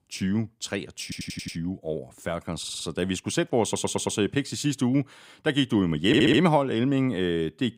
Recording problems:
audio stuttering; 4 times, first at 1 s

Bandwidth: 15.5 kHz